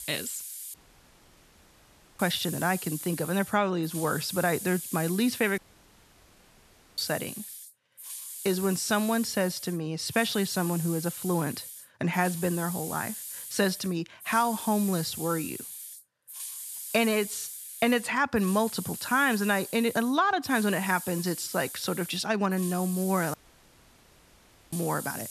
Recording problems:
hiss; loud; throughout; 9 dB below the speech
audio cutting out; at 0.5 s for 1.5 s, at 5.5 s for 1.5 s and at 23 s for 1.5 s

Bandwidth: 13.5 kHz